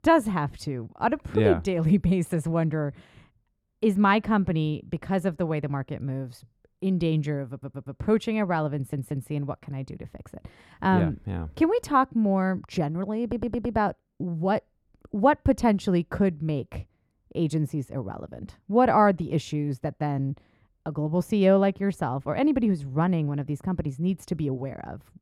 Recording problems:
muffled; slightly; fading above 2 kHz
audio stuttering; at 7.5 s, at 8.5 s and at 13 s

